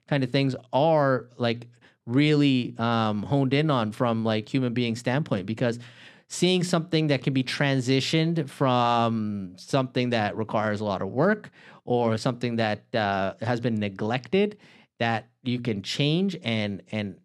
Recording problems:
none

